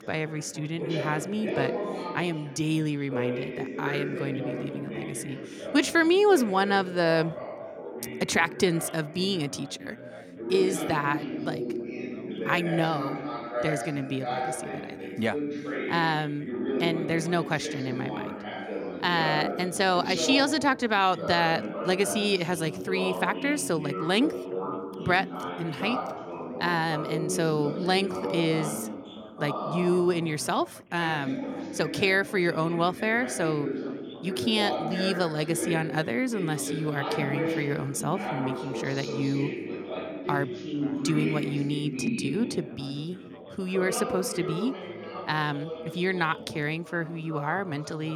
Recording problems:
background chatter; loud; throughout; 3 voices, 6 dB below the speech
abrupt cut into speech; at the end

